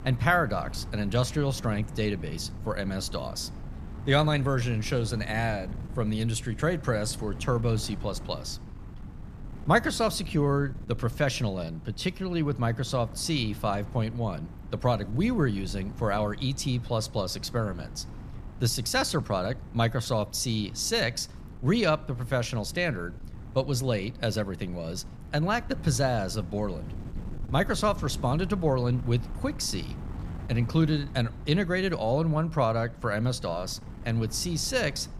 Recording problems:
wind noise on the microphone; occasional gusts; 20 dB below the speech

